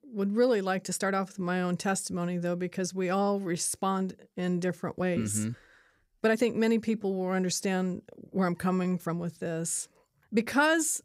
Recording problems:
uneven, jittery; strongly; from 1 to 11 s

